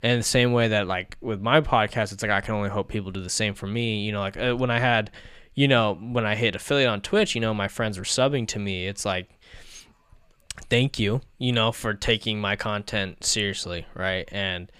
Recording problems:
none

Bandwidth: 14.5 kHz